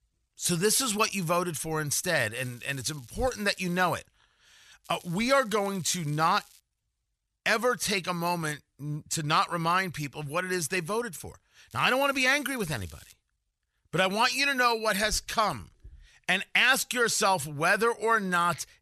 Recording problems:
crackling; faint; from 2.5 to 4 s, from 5 to 6.5 s and from 12 to 13 s; 25 dB below the speech

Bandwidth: 13.5 kHz